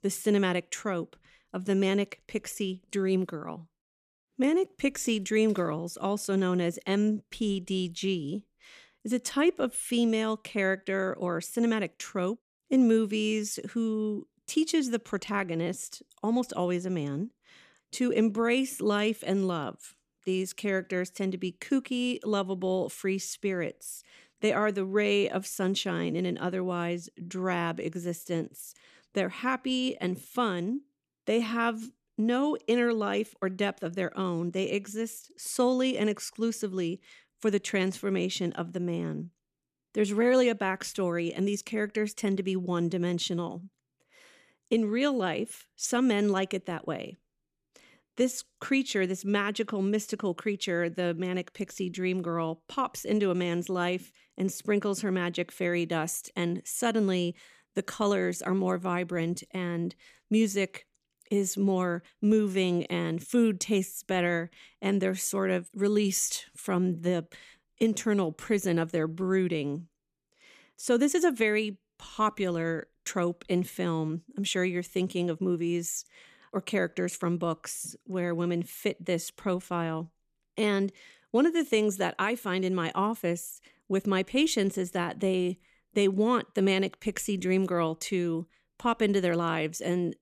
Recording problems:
none

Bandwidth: 14.5 kHz